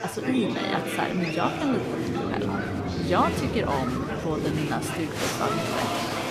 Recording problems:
chatter from many people; very loud; throughout; as loud as the speech

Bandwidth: 14.5 kHz